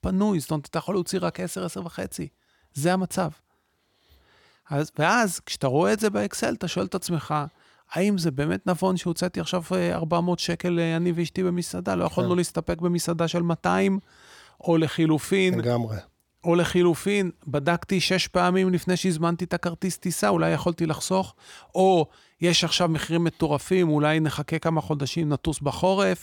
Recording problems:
none

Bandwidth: 18 kHz